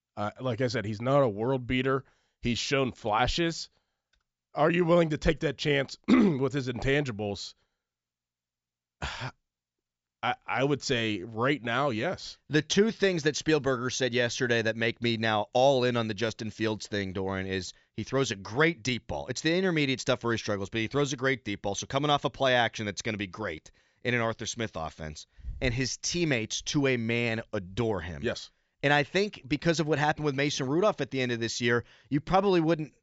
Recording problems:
high frequencies cut off; noticeable; nothing above 8 kHz

